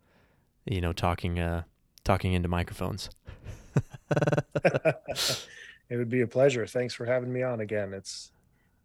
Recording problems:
audio stuttering; at 4 s

